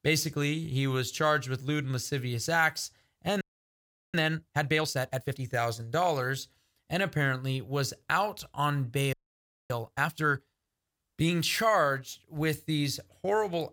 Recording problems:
audio freezing; at 3.5 s for 0.5 s and at 9 s for 0.5 s

